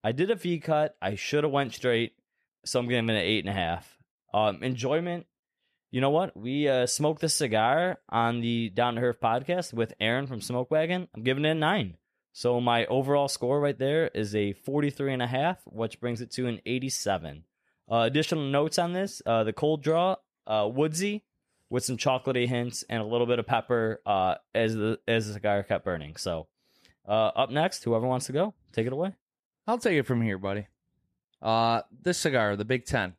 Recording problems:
none

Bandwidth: 14.5 kHz